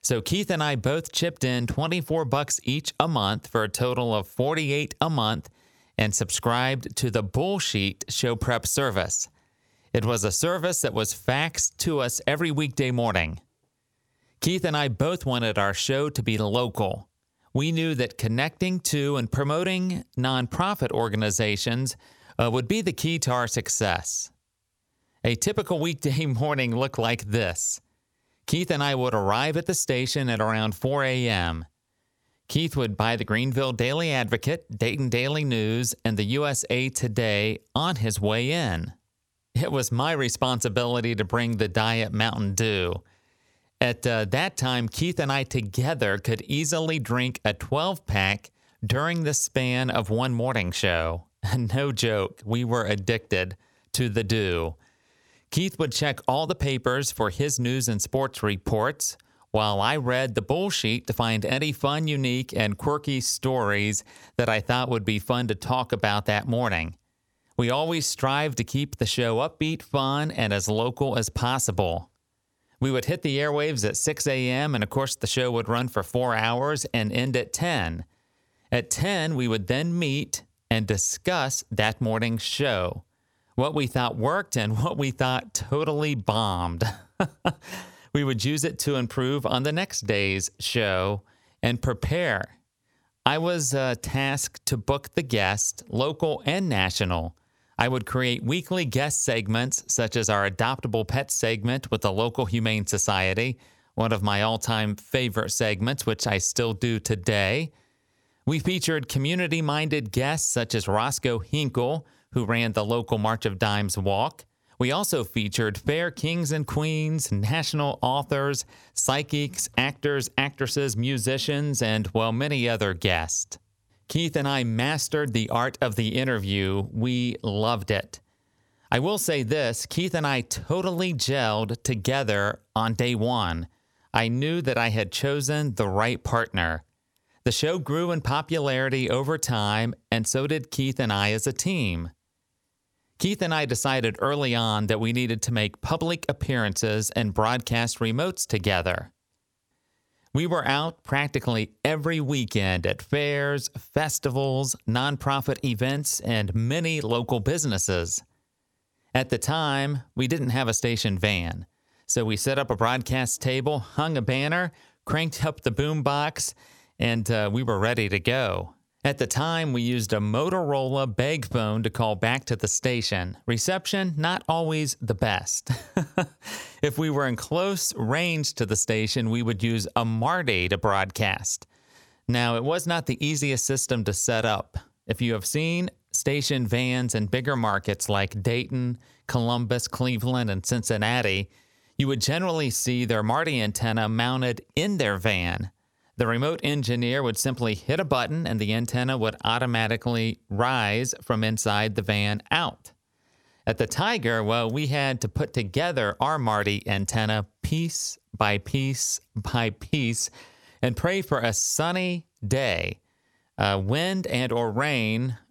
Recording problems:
squashed, flat; somewhat

